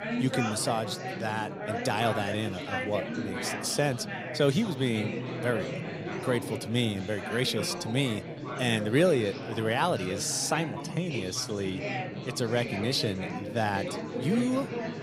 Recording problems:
chatter from many people; loud; throughout; 5 dB below the speech

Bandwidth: 15.5 kHz